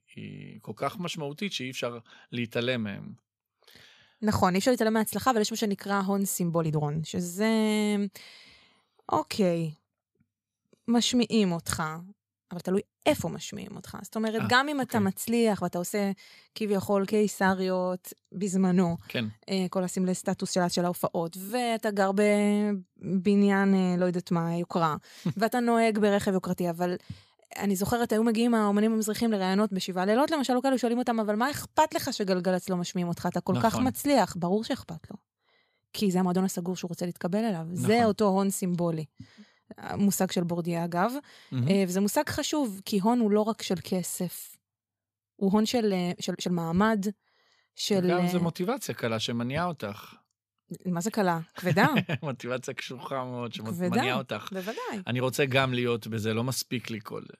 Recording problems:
uneven, jittery; strongly; from 1 to 53 s

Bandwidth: 14.5 kHz